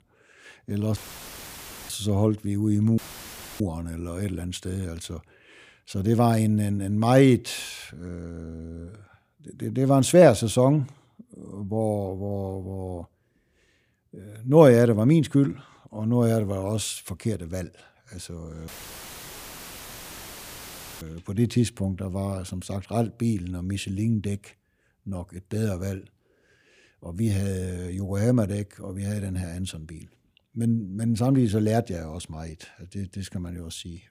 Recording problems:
audio cutting out; filled with static; at 1 s for 1 s, at 3 s for 0.5 s and at 19 s for 2.5 s

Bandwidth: 15 kHz